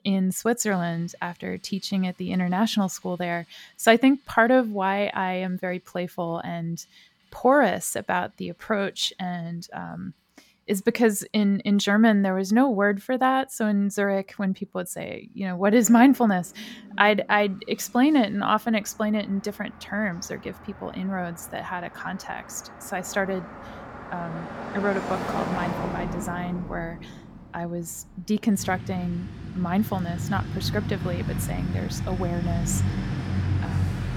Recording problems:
traffic noise; loud; throughout; 8 dB below the speech

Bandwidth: 17 kHz